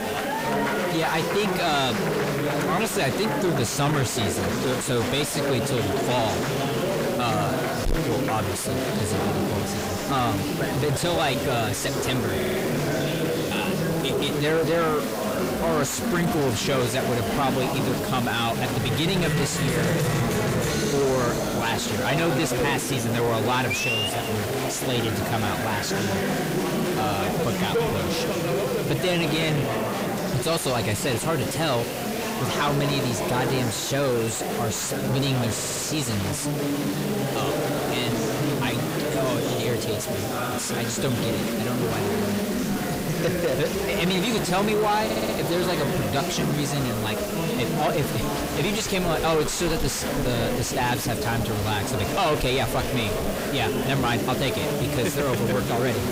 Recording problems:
distortion; heavy; 5 dB below the speech
chatter from many people; loud; throughout; as loud as the speech
hiss; noticeable; throughout; 10 dB below the speech
audio stuttering; at 12 s, at 36 s and at 45 s

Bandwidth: 15.5 kHz